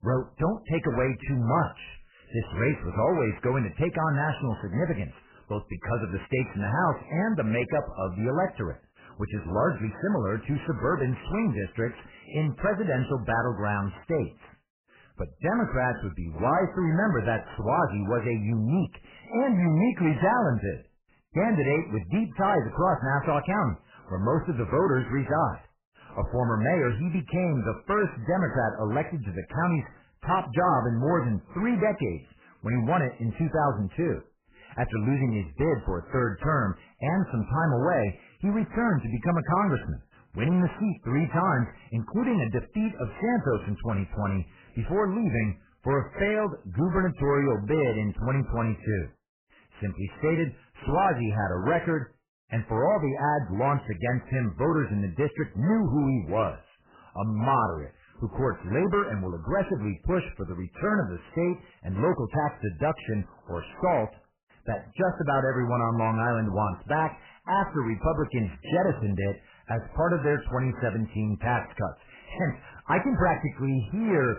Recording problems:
garbled, watery; badly; nothing above 3 kHz
distortion; slight; 10 dB below the speech

